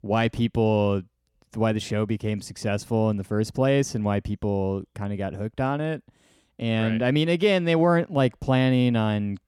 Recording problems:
none

